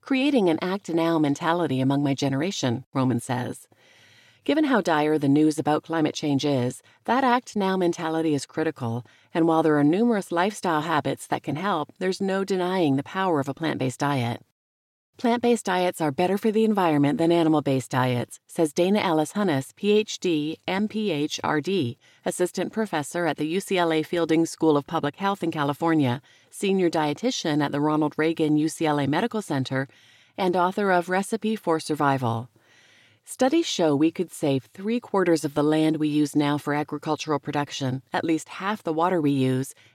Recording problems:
none

